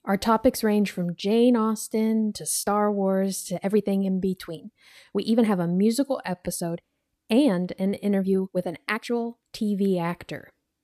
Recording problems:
uneven, jittery; strongly; from 2 to 9.5 s

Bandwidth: 14.5 kHz